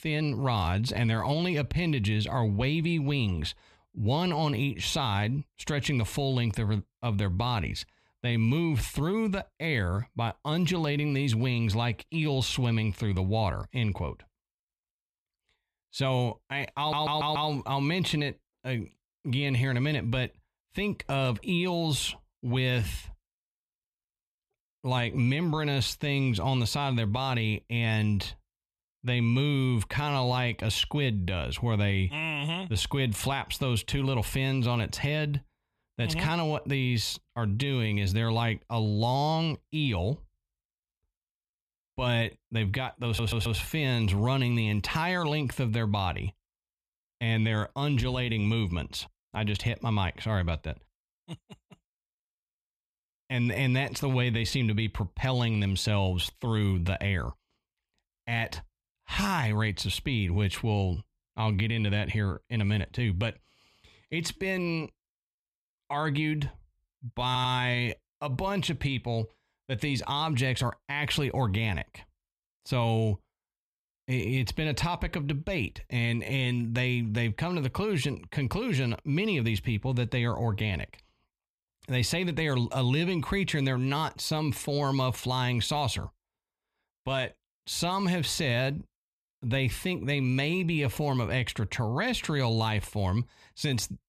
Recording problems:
audio stuttering; at 17 s, at 43 s and at 1:07

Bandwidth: 14 kHz